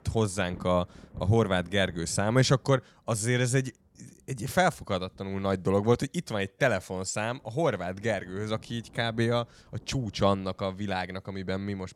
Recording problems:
rain or running water; faint; throughout; 25 dB below the speech

